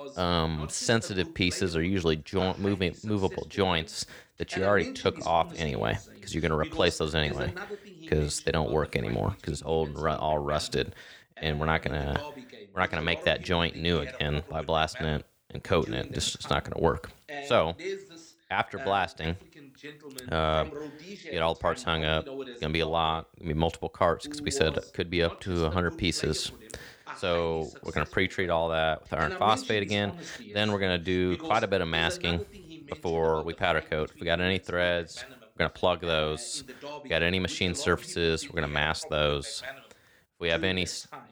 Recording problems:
voice in the background; noticeable; throughout; 15 dB below the speech

